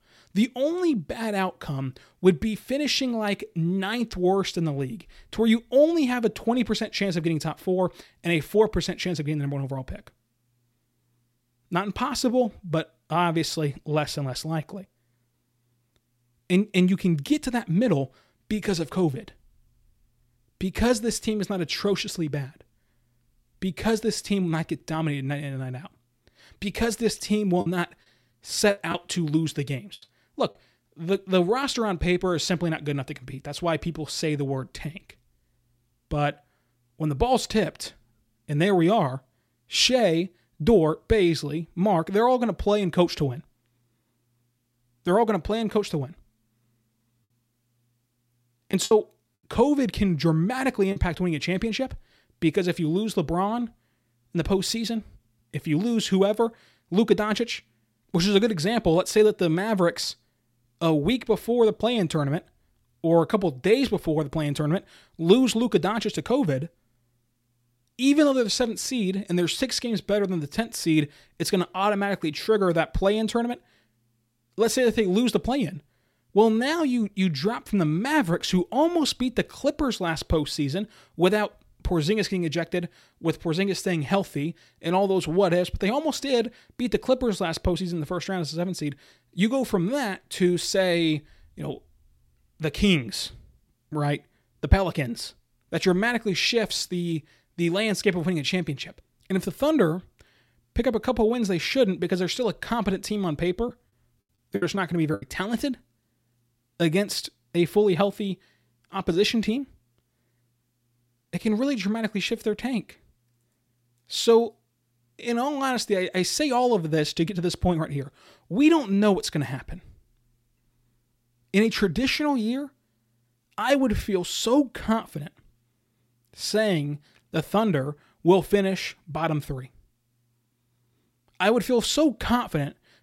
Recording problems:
choppy; very; from 28 to 31 s, from 49 to 51 s and from 1:44 to 1:45; 9% of the speech affected

